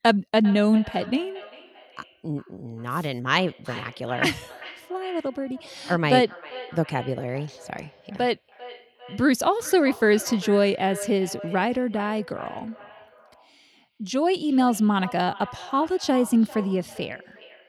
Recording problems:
echo of what is said; noticeable; throughout; 400 ms later, 20 dB below the speech

